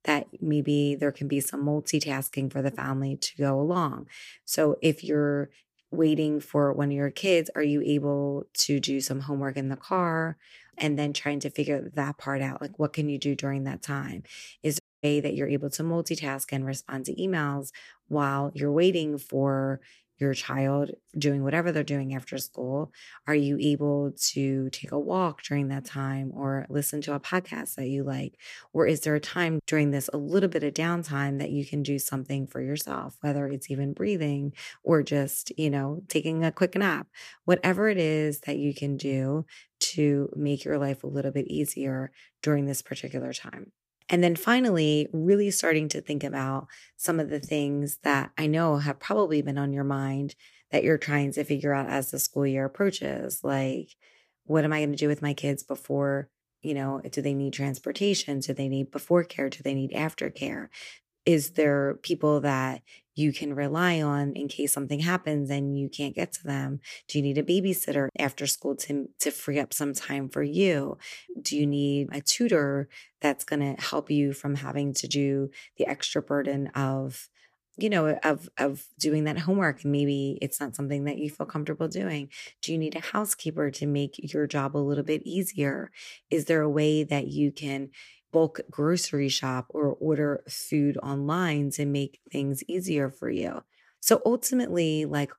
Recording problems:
audio cutting out; at 15 s

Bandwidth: 15 kHz